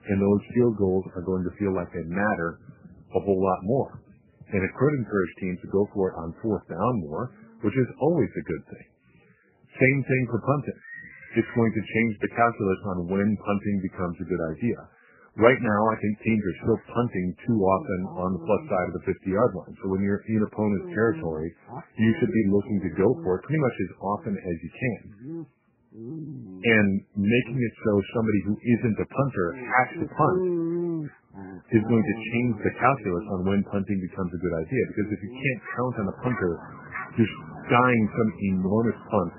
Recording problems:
garbled, watery; badly; nothing above 3 kHz
animal sounds; noticeable; throughout; 10 dB below the speech

